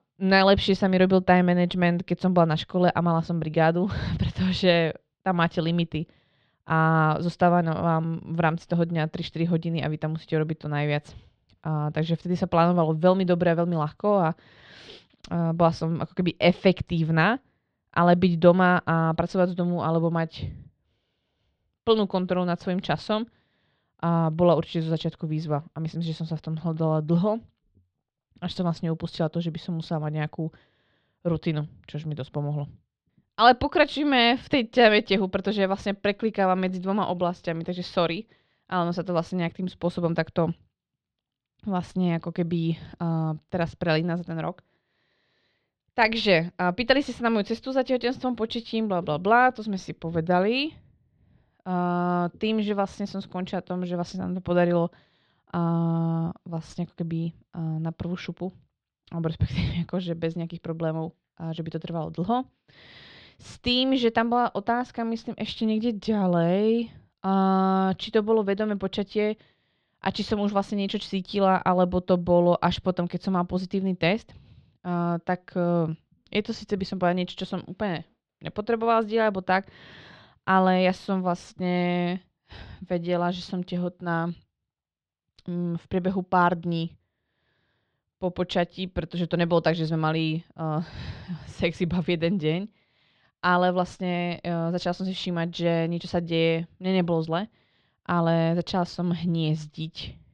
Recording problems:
muffled; slightly; fading above 3.5 kHz

